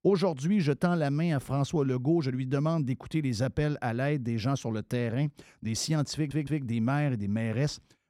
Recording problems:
audio stuttering; at 6 s

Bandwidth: 16.5 kHz